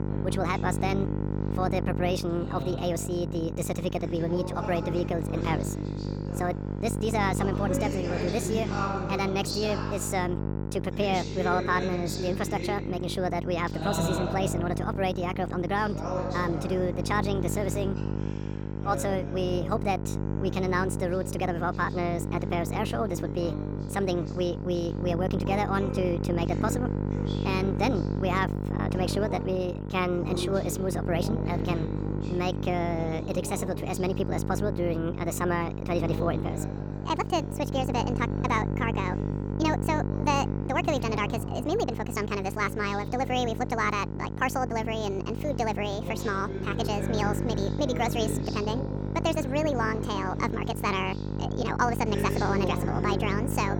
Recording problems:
wrong speed and pitch; too fast and too high; 1.5 times normal speed
electrical hum; loud; throughout; 50 Hz, 9 dB below the speech
voice in the background; loud; throughout; 9 dB below the speech

